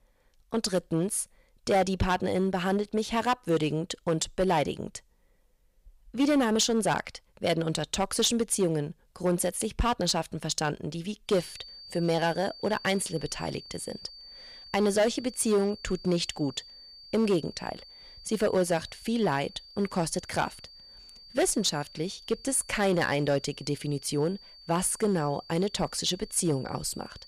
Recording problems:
distortion; slight; 4% of the sound clipped
high-pitched whine; noticeable; from 11 s on; 4.5 kHz, 20 dB below the speech

